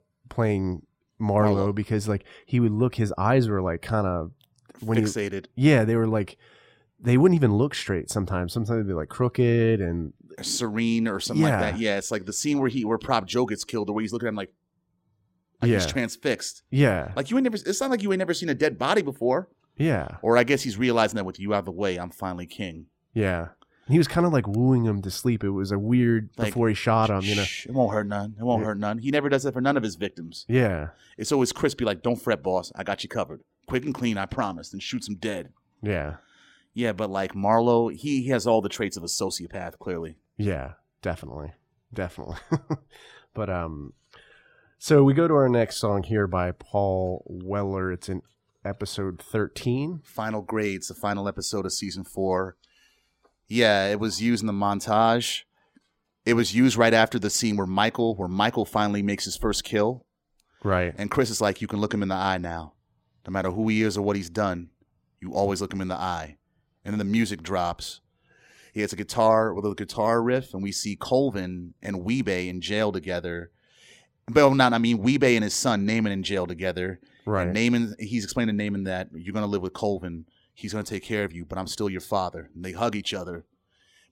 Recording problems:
none

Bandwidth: 16 kHz